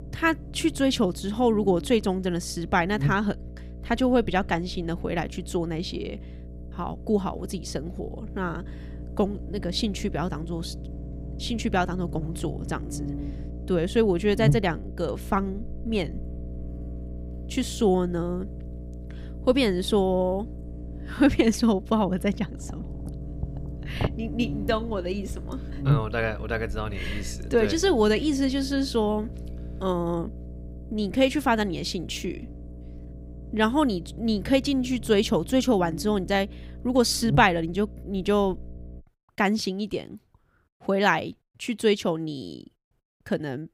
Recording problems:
electrical hum; noticeable; until 39 s; 60 Hz, 20 dB below the speech

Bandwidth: 15.5 kHz